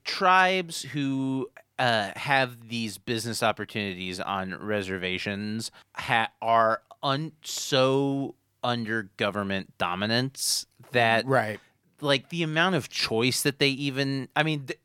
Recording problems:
none

